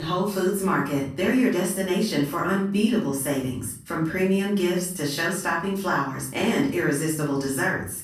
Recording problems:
off-mic speech; far
room echo; noticeable; dies away in 0.5 s
abrupt cut into speech; at the start

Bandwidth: 14.5 kHz